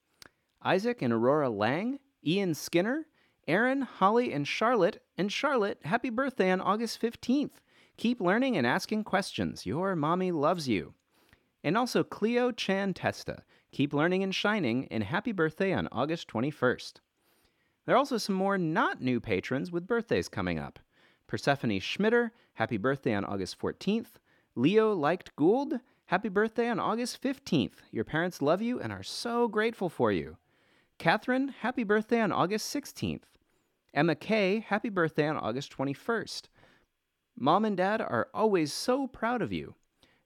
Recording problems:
none

